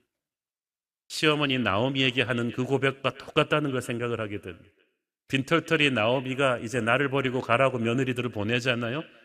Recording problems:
echo of what is said; faint; throughout; 320 ms later, 25 dB below the speech

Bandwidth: 15 kHz